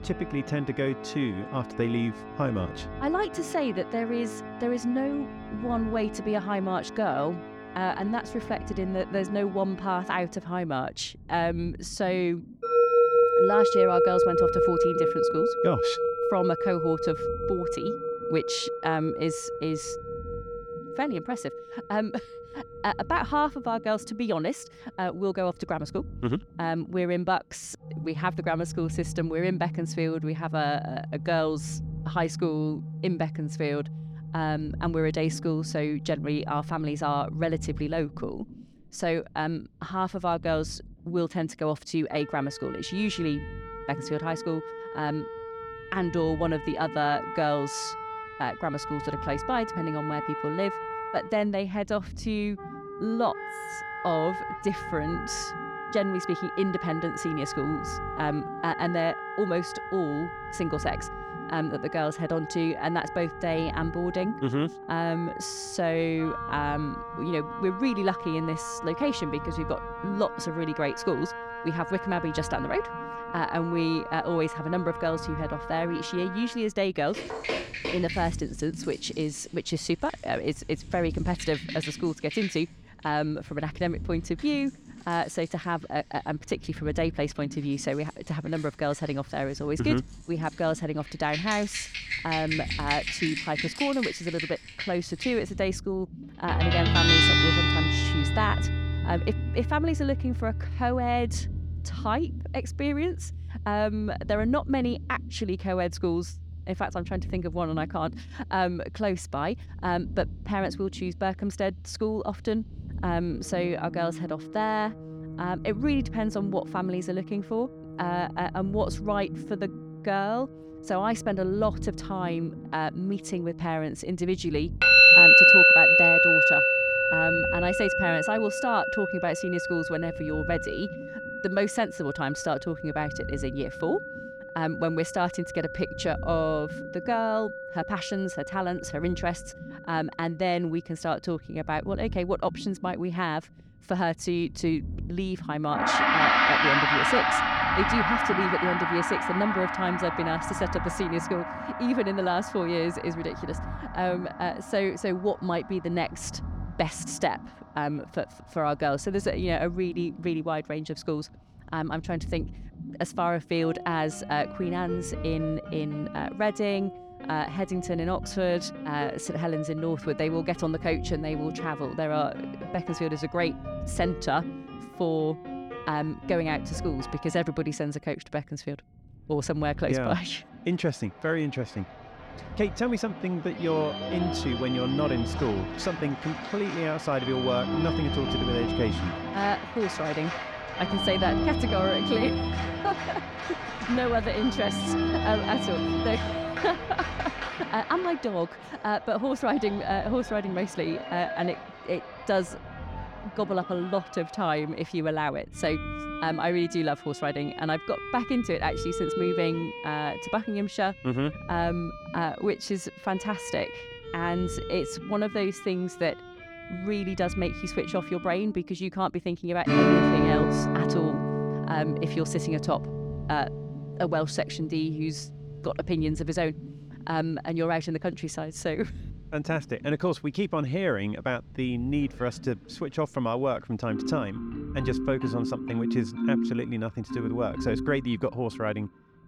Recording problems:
background music; very loud; throughout; 2 dB above the speech
low rumble; faint; throughout; 25 dB below the speech

